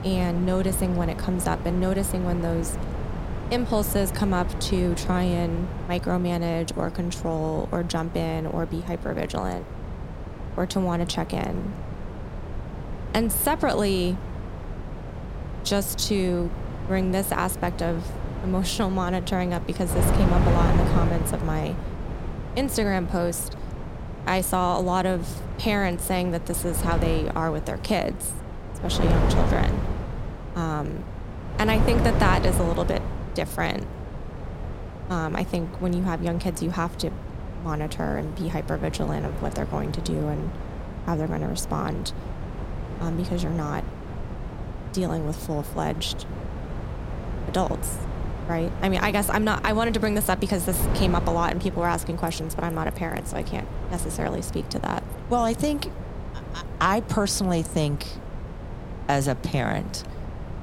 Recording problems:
wind noise on the microphone; heavy; 9 dB below the speech

